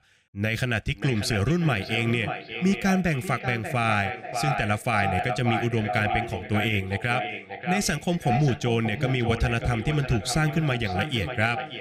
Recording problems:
echo of what is said; strong; throughout; 590 ms later, 7 dB below the speech

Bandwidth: 15.5 kHz